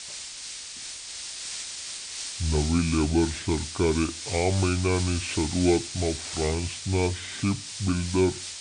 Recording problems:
high frequencies cut off; severe; nothing above 4 kHz
wrong speed and pitch; too slow and too low; 0.6 times normal speed
hiss; loud; throughout; 7 dB below the speech

